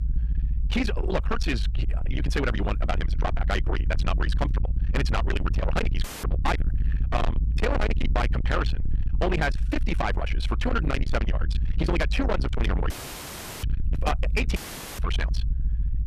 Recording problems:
distortion; heavy; 7 dB below the speech
wrong speed, natural pitch; too fast; 1.8 times normal speed
low rumble; loud; throughout; 7 dB below the speech
audio cutting out; filled with static; at 6 s, at 13 s for 0.5 s and at 15 s

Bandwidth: 14.5 kHz